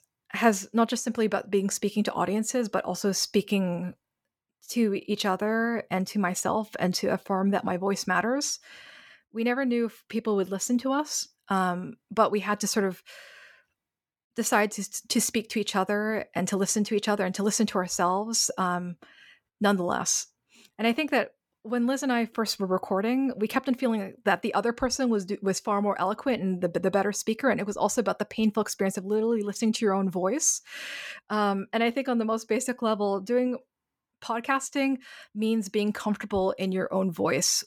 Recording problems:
none

